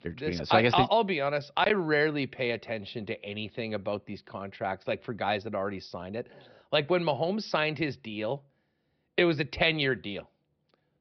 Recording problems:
high frequencies cut off; noticeable; nothing above 5.5 kHz

